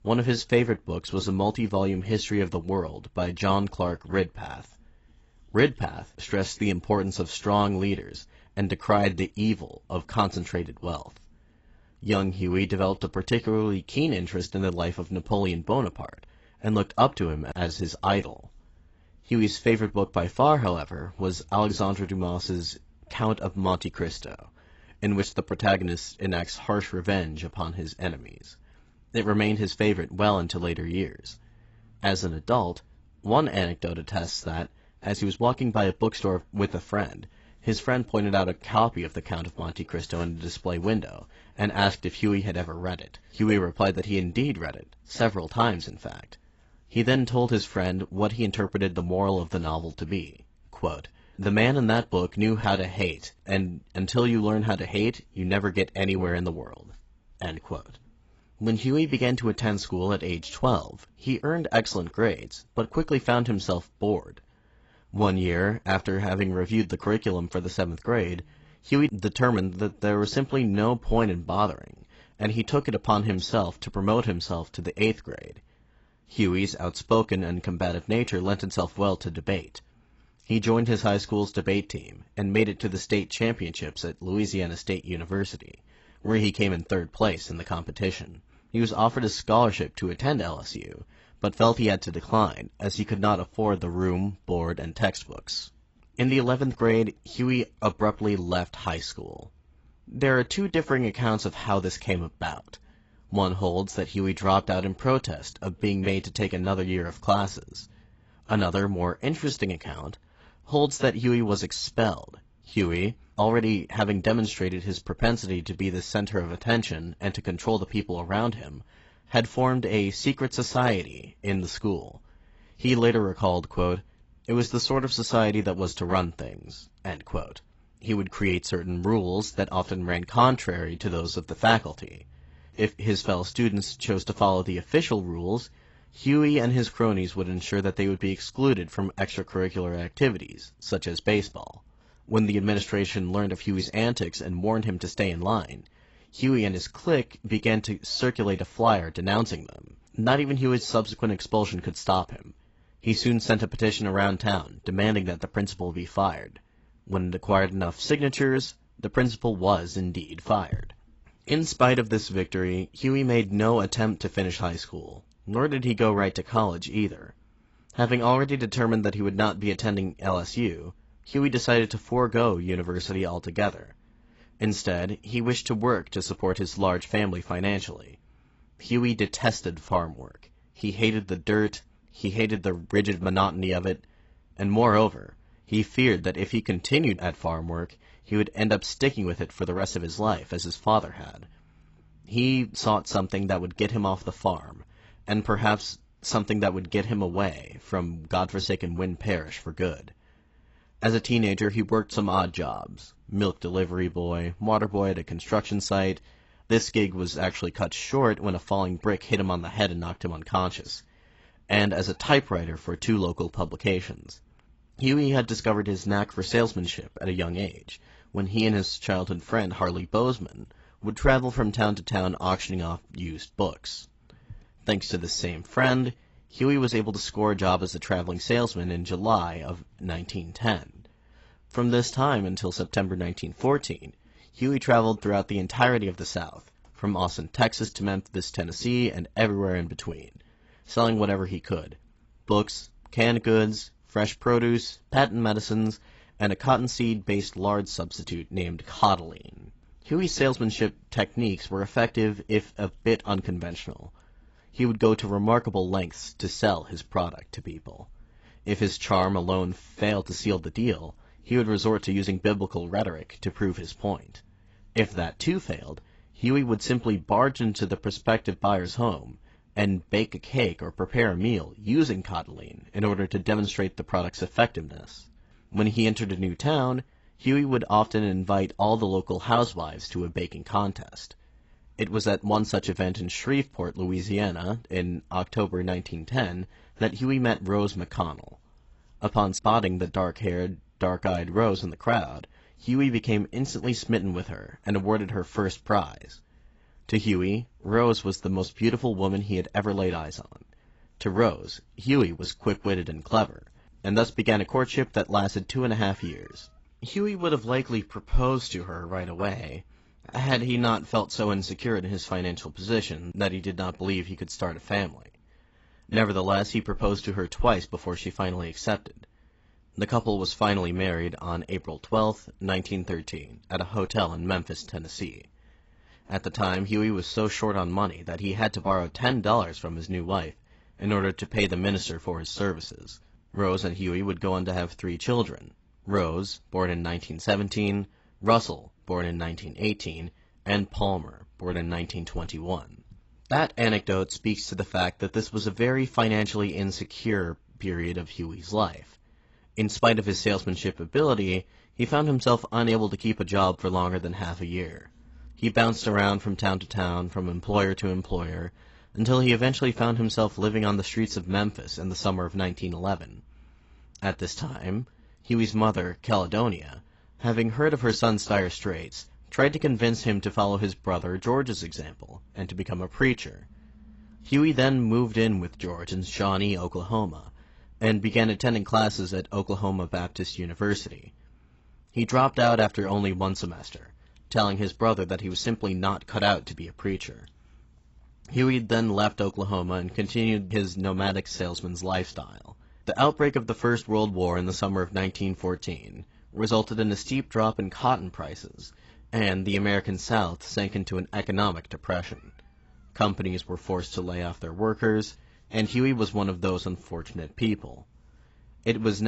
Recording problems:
garbled, watery; badly; nothing above 8 kHz
abrupt cut into speech; at the end

